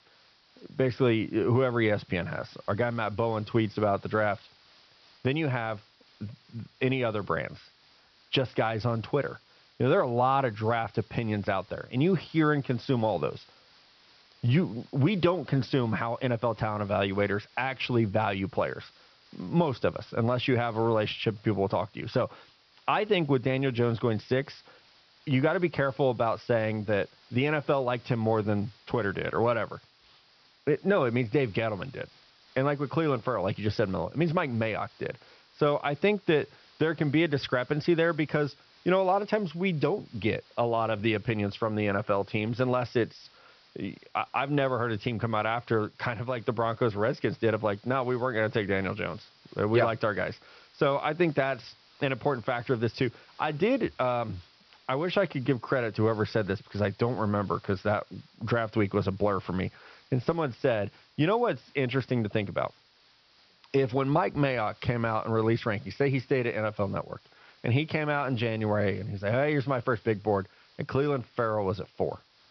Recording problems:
high frequencies cut off; noticeable; nothing above 5.5 kHz
hiss; faint; throughout; 30 dB below the speech

